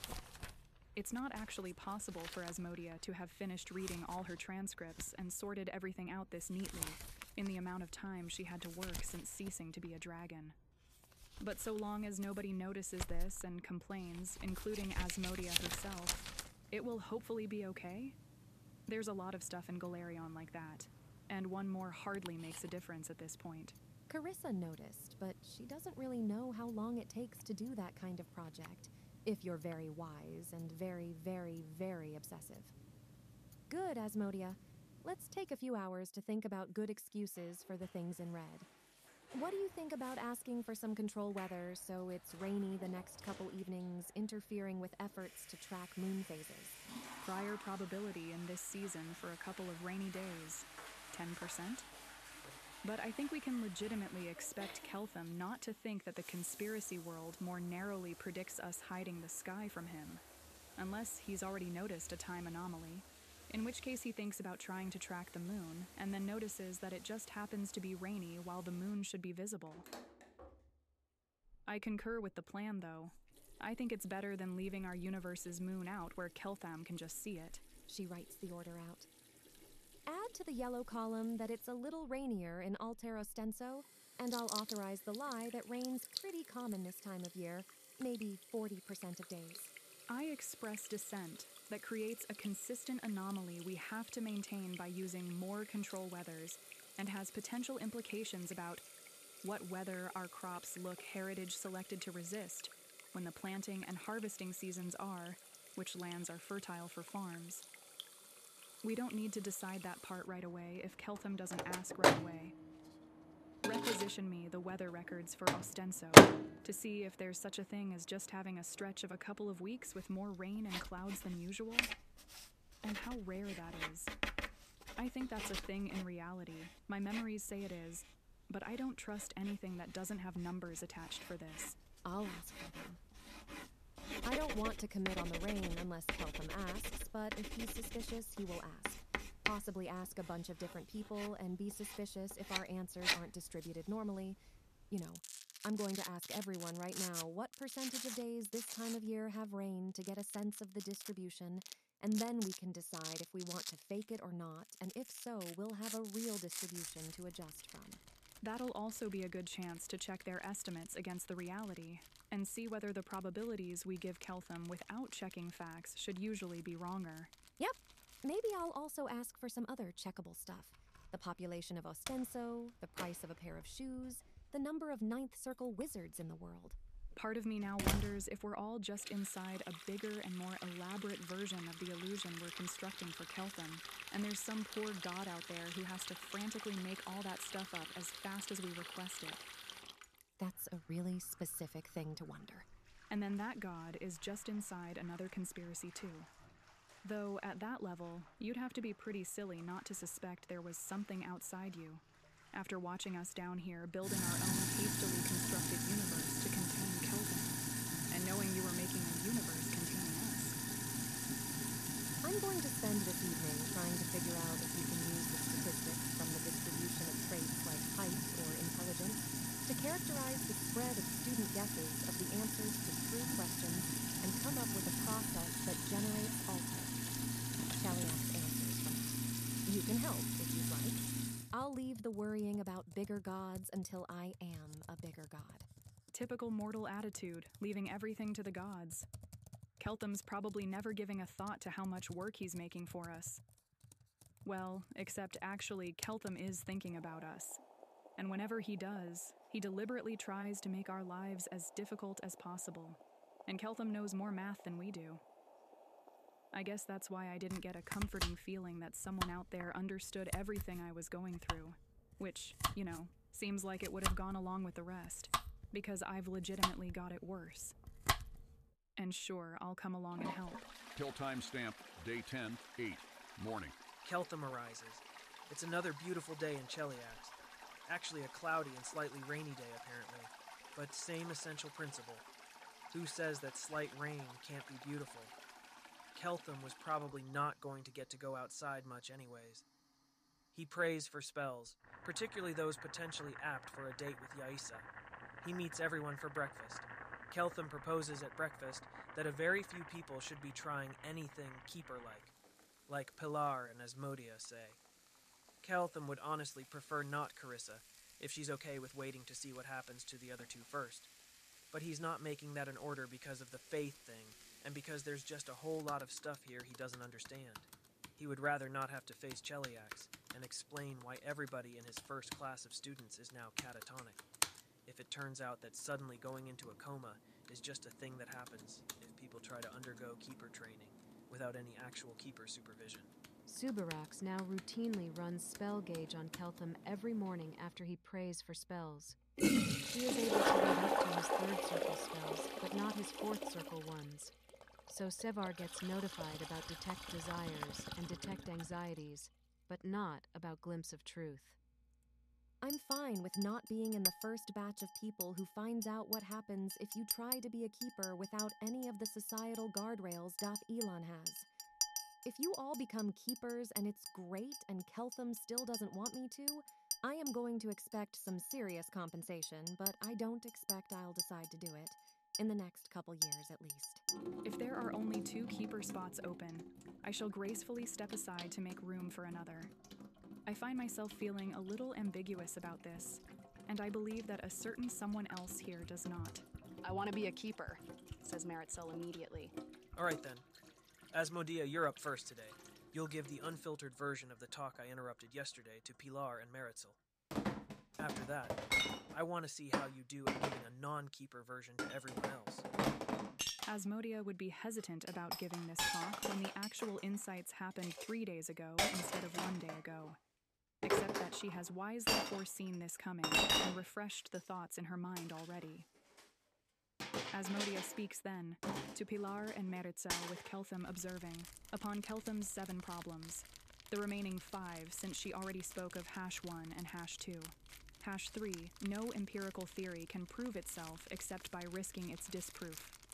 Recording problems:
household noises; very loud; throughout; 4 dB above the speech

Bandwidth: 14.5 kHz